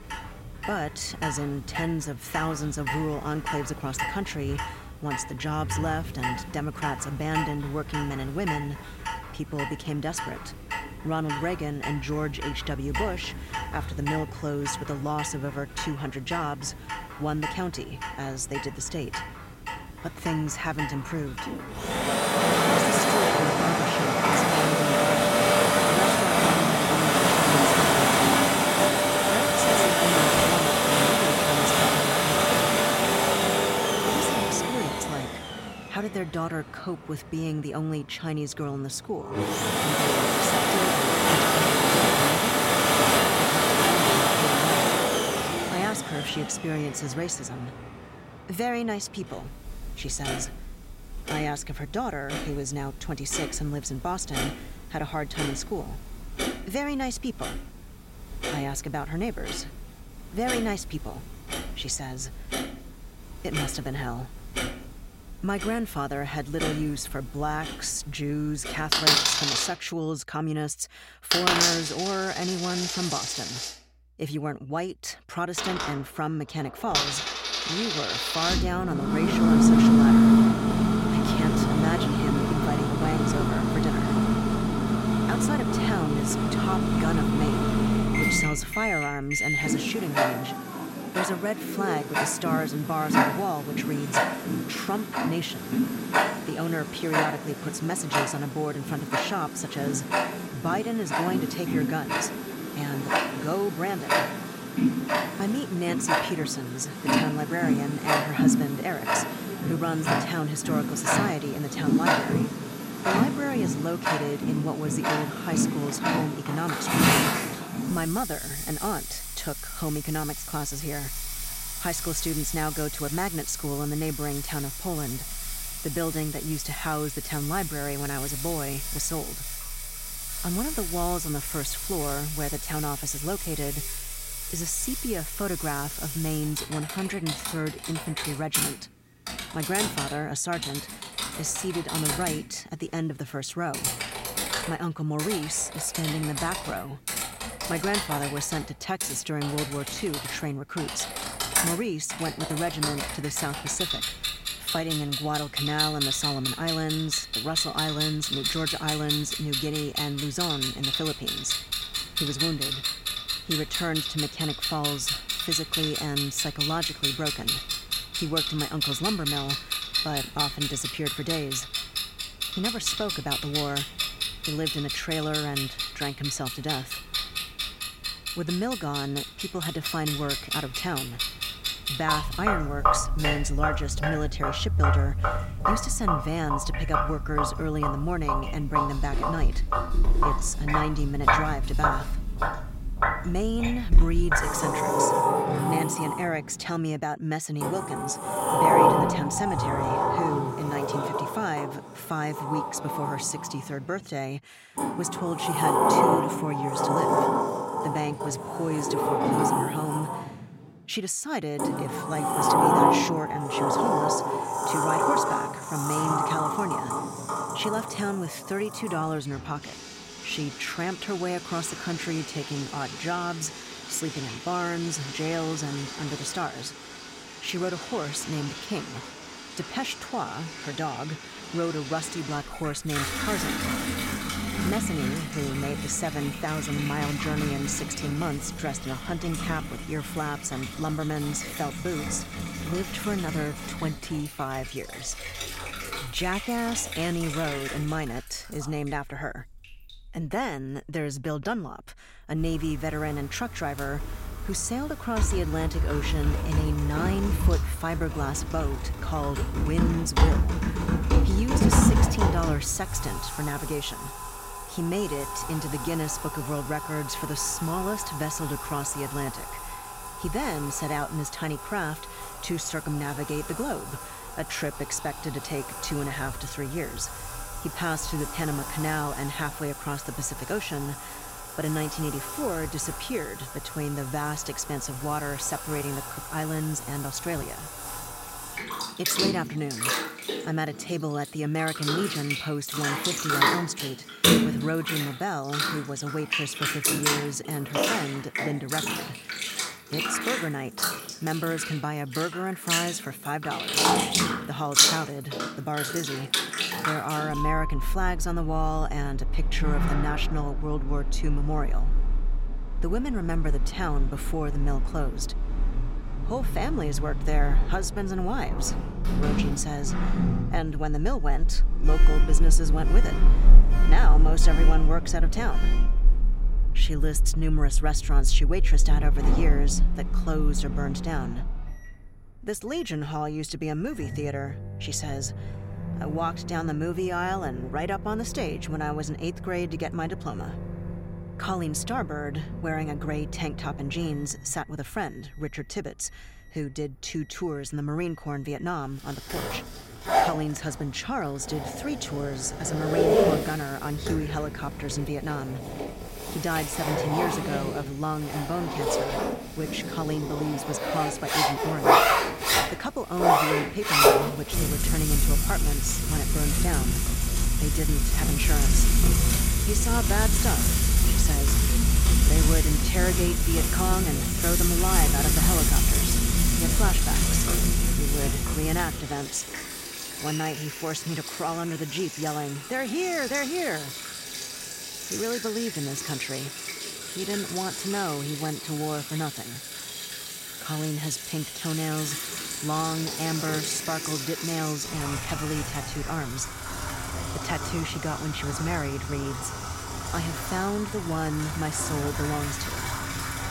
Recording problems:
household noises; very loud; throughout; 4 dB above the speech

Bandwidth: 16 kHz